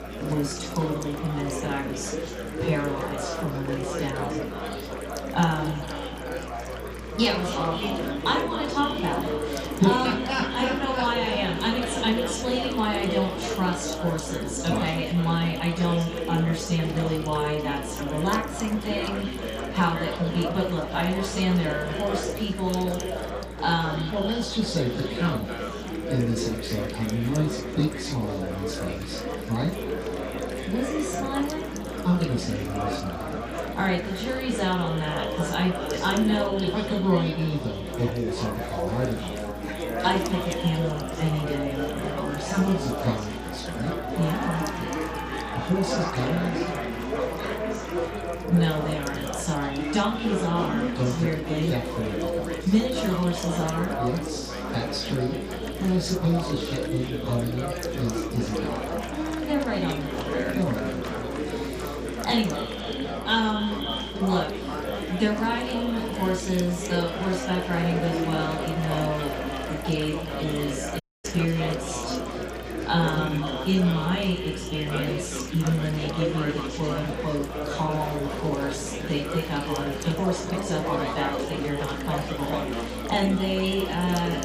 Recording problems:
off-mic speech; far
echo of what is said; noticeable; throughout; 250 ms later, 15 dB below the speech
room echo; noticeable; dies away in 0.3 s
chatter from many people; loud; throughout; 4 dB below the speech
electrical hum; noticeable; throughout; 60 Hz, 20 dB below the speech
audio cutting out; at 1:11

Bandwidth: 15 kHz